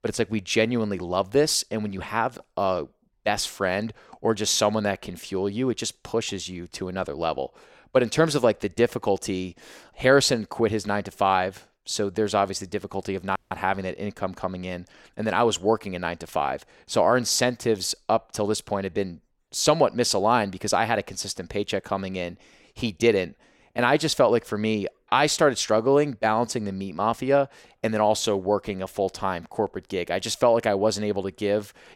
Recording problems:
audio cutting out; at 13 s

